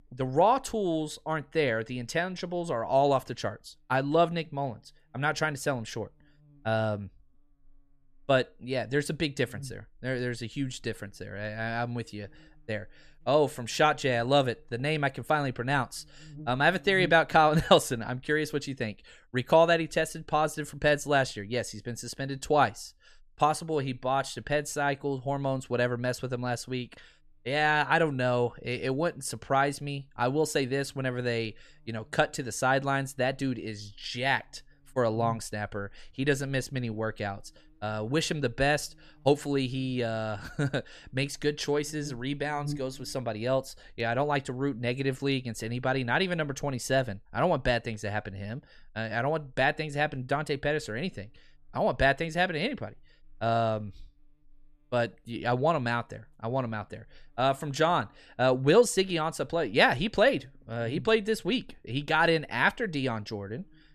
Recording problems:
electrical hum; faint; throughout; 60 Hz, 30 dB below the speech

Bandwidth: 14 kHz